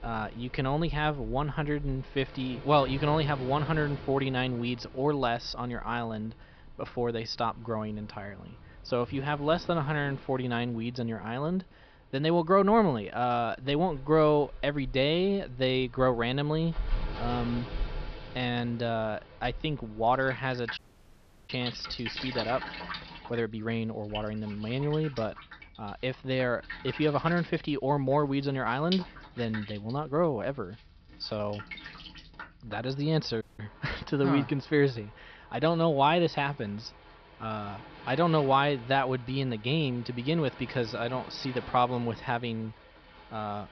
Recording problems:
high frequencies cut off; noticeable; nothing above 5.5 kHz
rain or running water; noticeable; throughout; 15 dB below the speech
audio cutting out; at 21 s for 0.5 s and at 33 s

